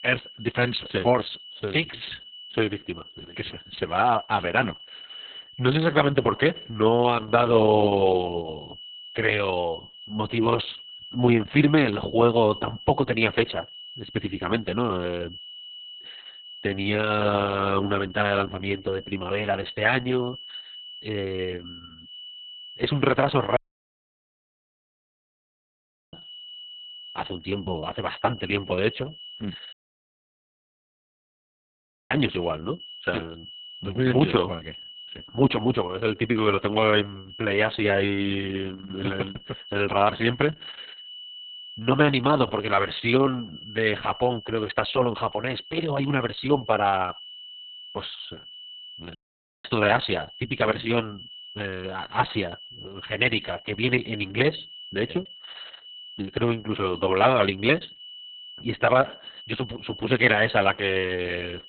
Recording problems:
garbled, watery; badly; nothing above 4 kHz
high-pitched whine; noticeable; throughout; 3 kHz, 15 dB below the speech
audio cutting out; at 24 s for 2.5 s, at 30 s for 2.5 s and at 49 s

